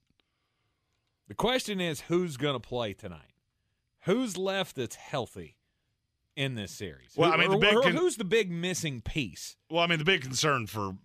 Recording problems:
none

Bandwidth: 14.5 kHz